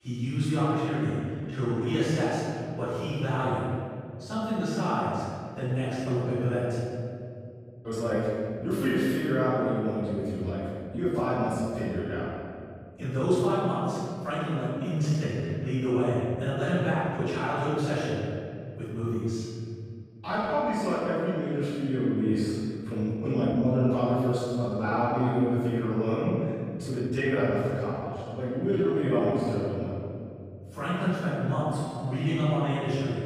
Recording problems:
room echo; strong; dies away in 2.4 s
off-mic speech; far
uneven, jittery; strongly; from 1.5 to 32 s

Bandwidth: 15 kHz